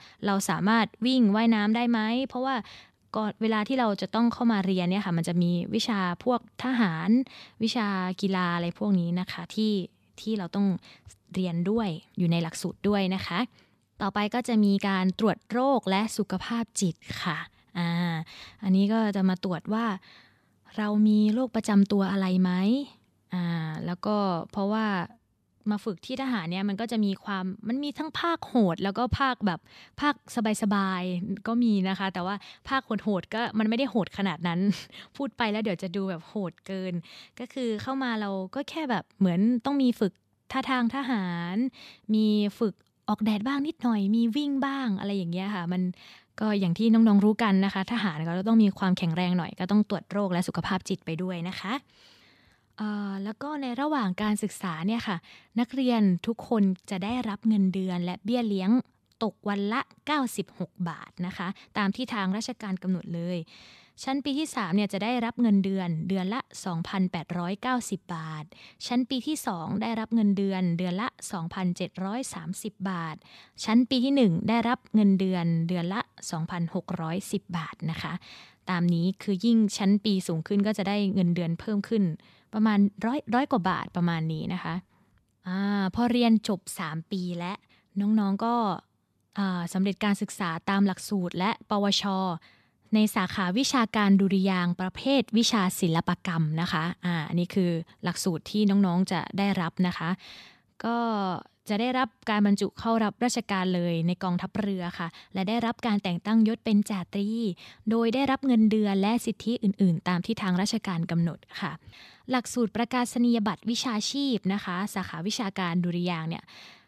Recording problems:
none

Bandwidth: 14 kHz